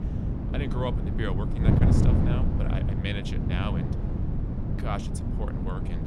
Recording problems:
wind noise on the microphone; heavy; as loud as the speech

